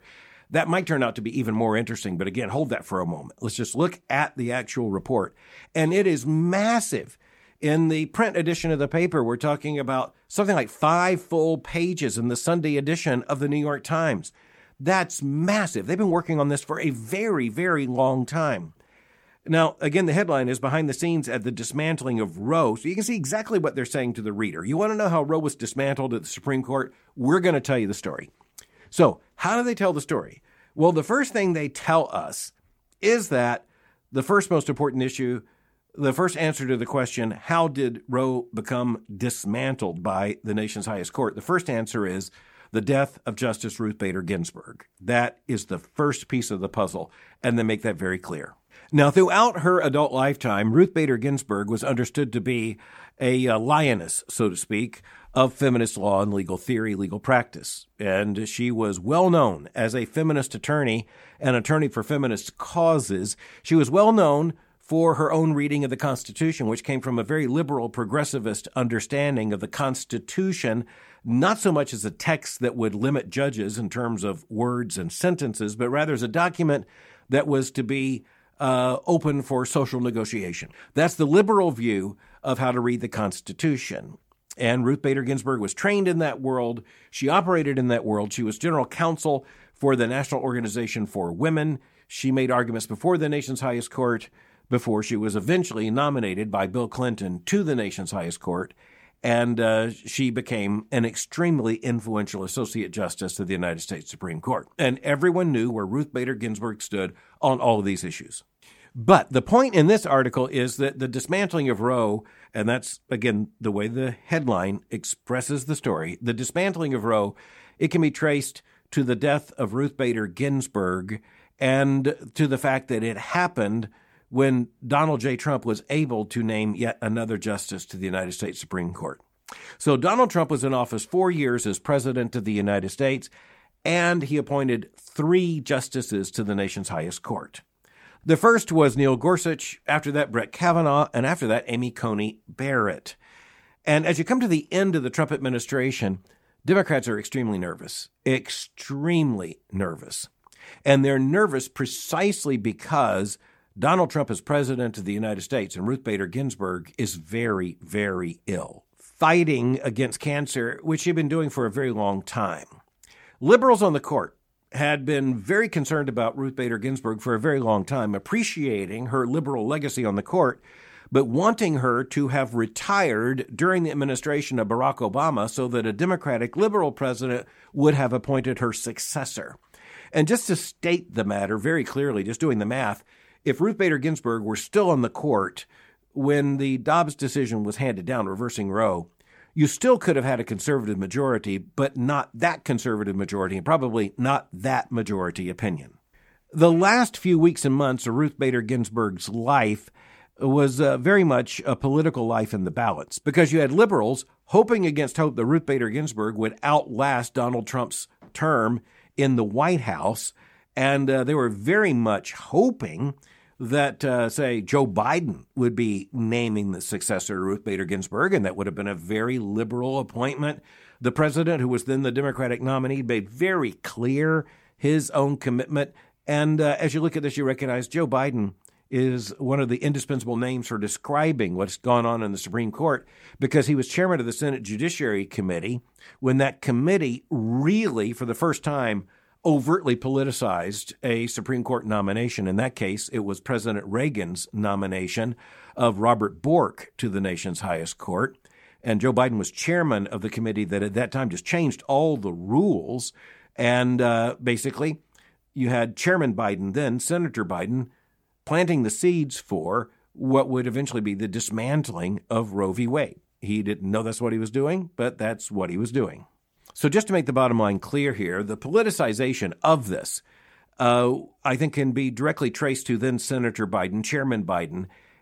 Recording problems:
none

